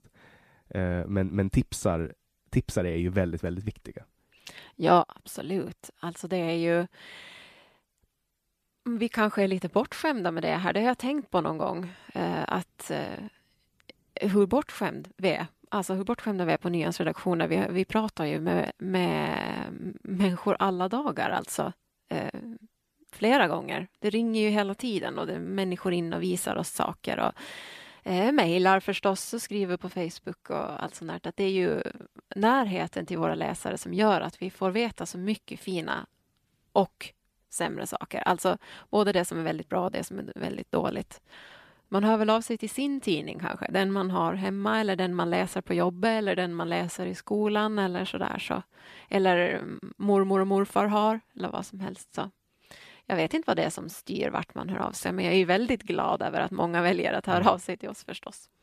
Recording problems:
none

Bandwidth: 14.5 kHz